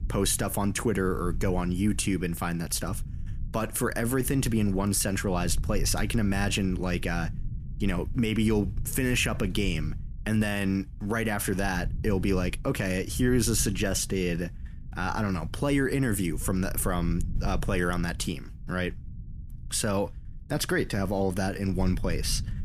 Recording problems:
low rumble; faint; throughout; 20 dB below the speech

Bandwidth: 14.5 kHz